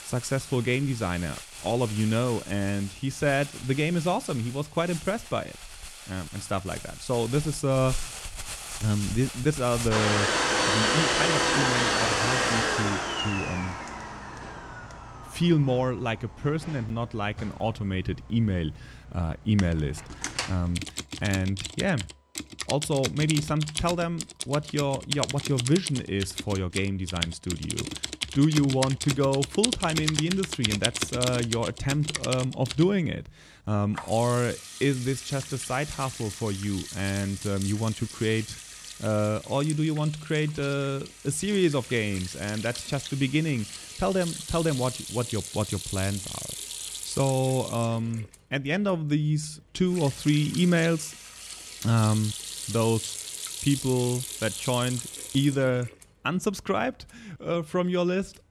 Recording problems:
household noises; loud; throughout; 4 dB below the speech

